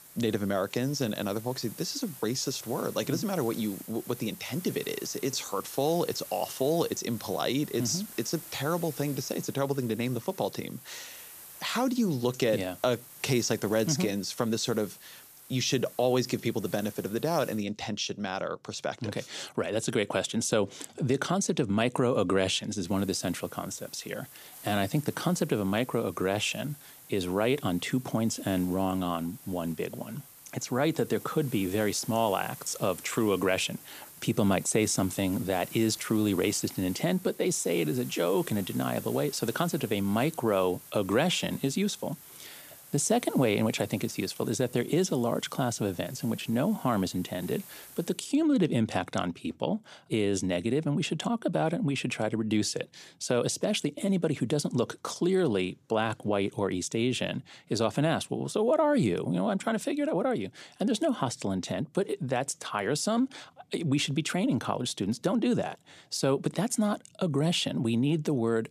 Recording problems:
hiss; noticeable; until 18 s and from 23 to 48 s; 15 dB below the speech

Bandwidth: 14.5 kHz